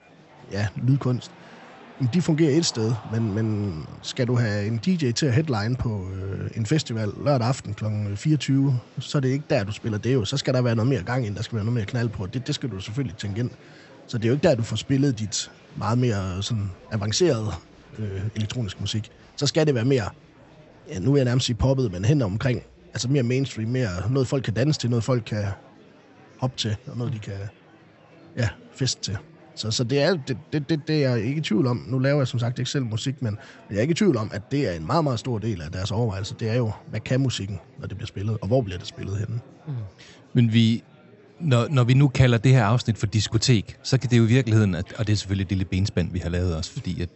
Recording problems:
high frequencies cut off; noticeable; nothing above 8 kHz
murmuring crowd; faint; throughout; 25 dB below the speech

